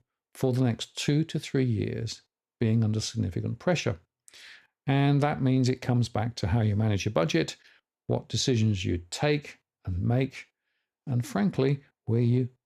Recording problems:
none

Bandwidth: 14.5 kHz